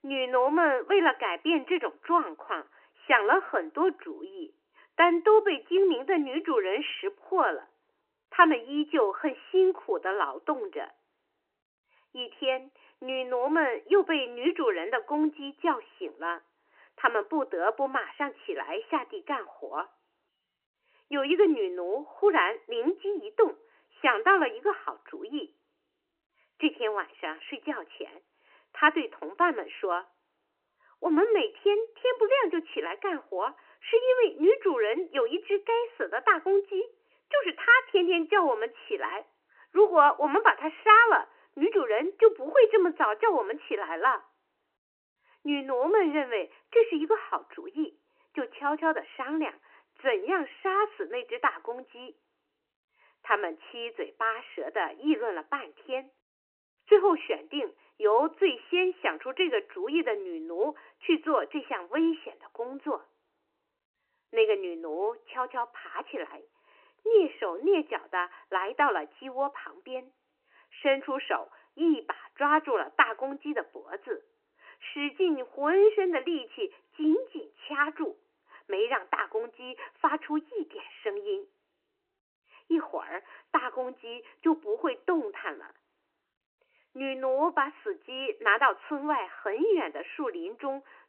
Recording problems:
phone-call audio; nothing above 3 kHz

